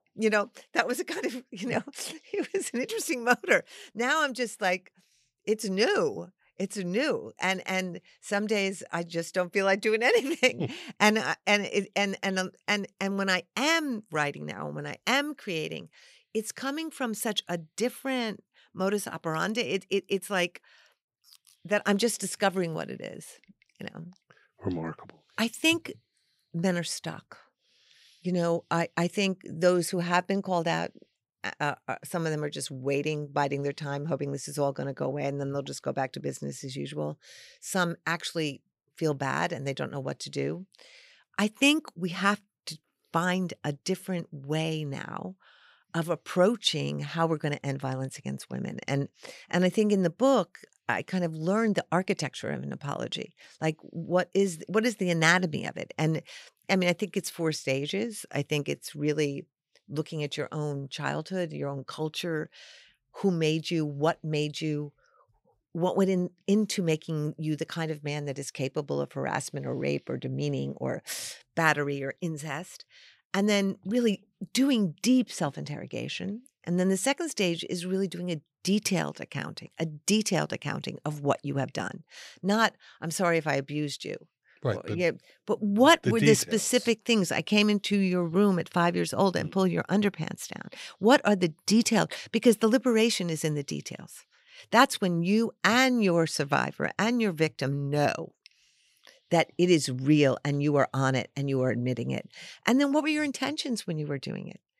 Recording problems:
none

